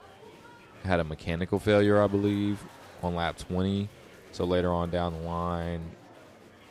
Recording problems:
murmuring crowd; faint; throughout; 20 dB below the speech

